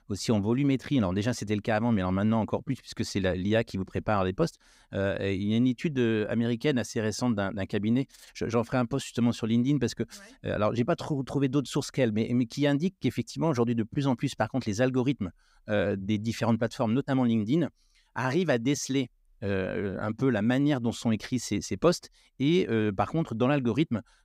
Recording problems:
none

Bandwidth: 15.5 kHz